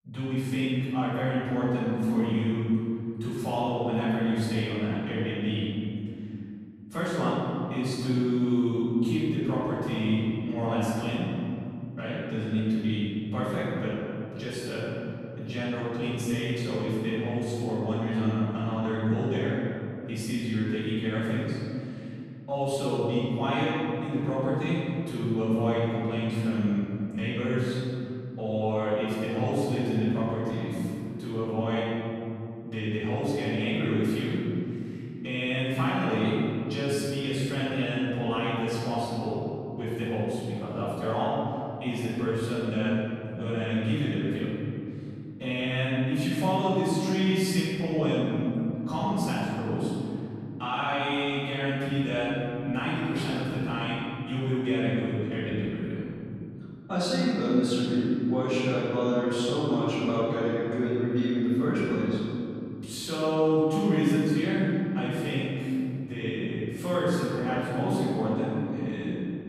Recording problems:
room echo; strong; dies away in 3 s
off-mic speech; far

